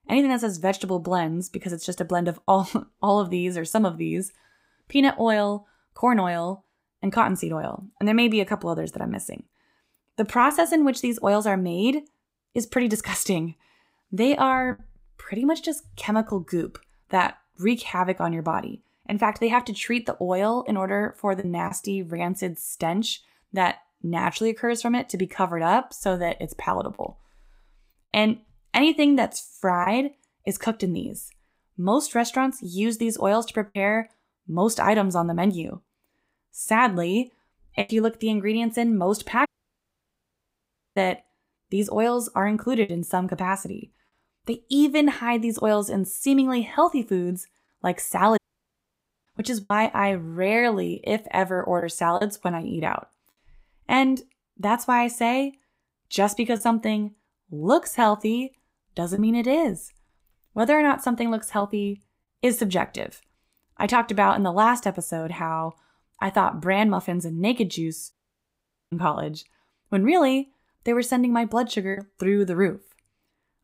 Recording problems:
choppy; occasionally; 2% of the speech affected
audio cutting out; at 39 s for 1.5 s, at 48 s for 1 s and at 1:08 for 1 s

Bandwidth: 15.5 kHz